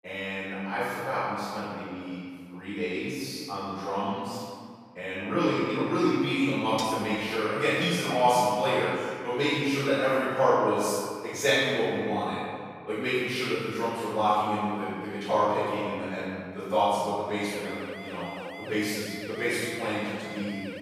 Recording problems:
room echo; strong; dies away in 1.9 s
off-mic speech; far
clattering dishes; noticeable; at 7 s; peak 10 dB below the speech
siren; faint; from 17 s on; peak 10 dB below the speech

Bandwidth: 15 kHz